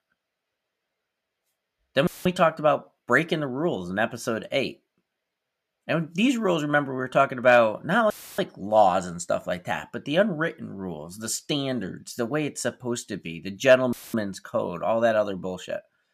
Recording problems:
audio cutting out; filled with static; at 2 s, at 8 s and at 14 s

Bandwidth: 14.5 kHz